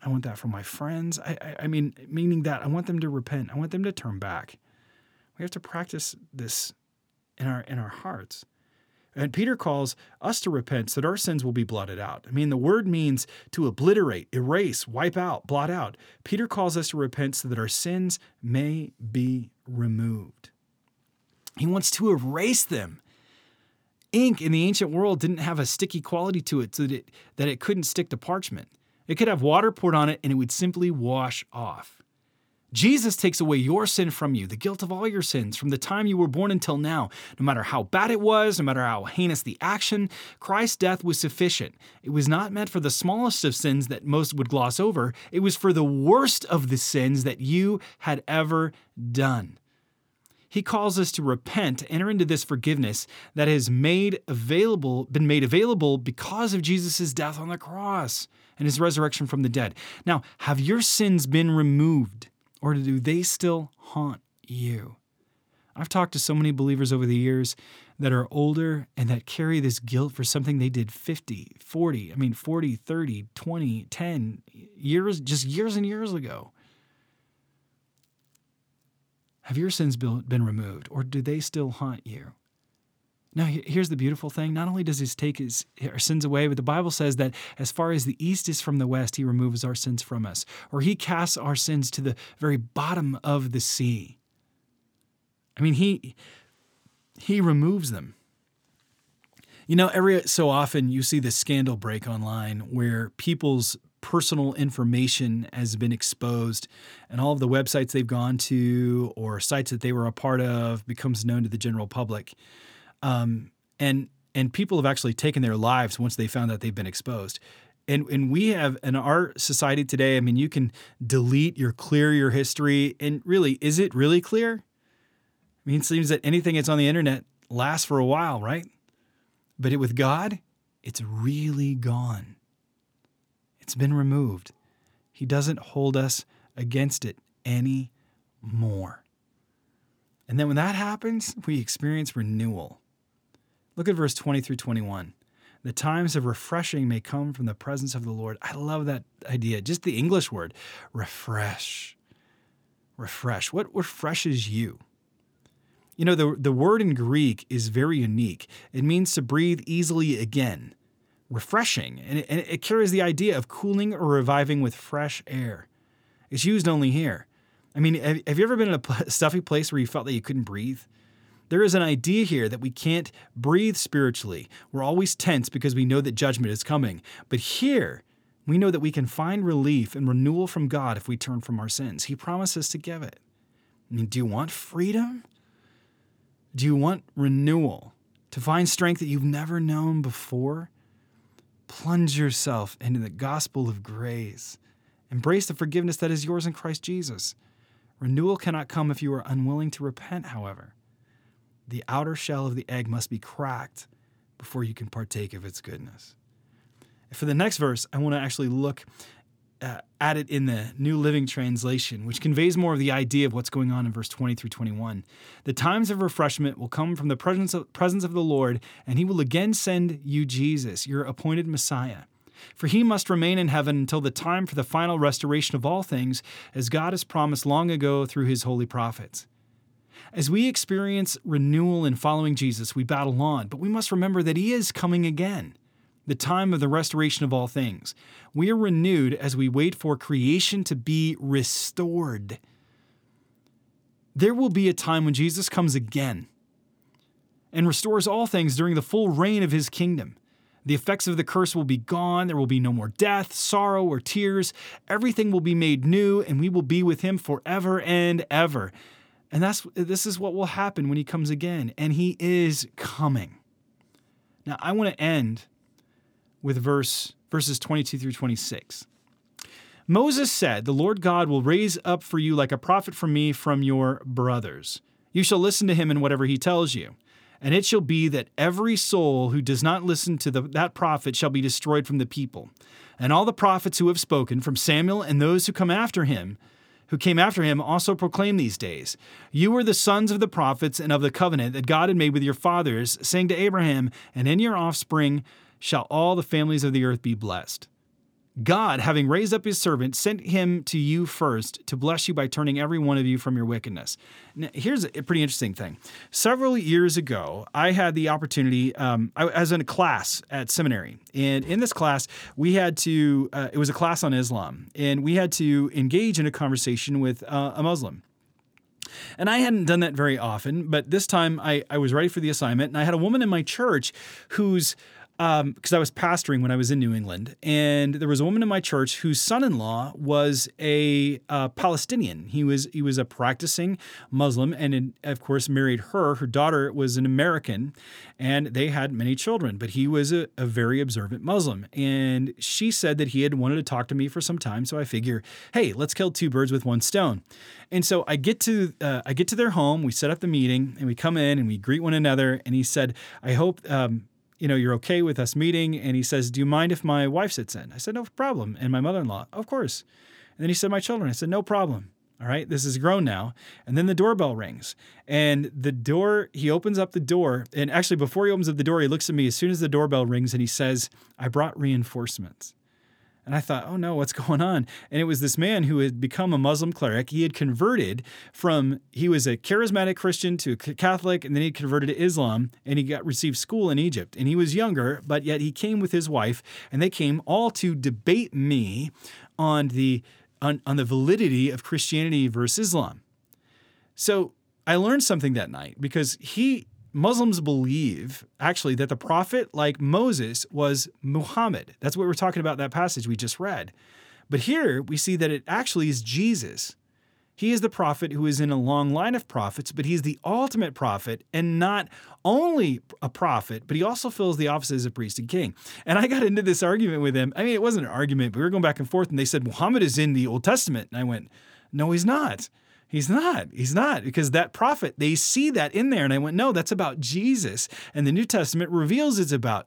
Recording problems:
none

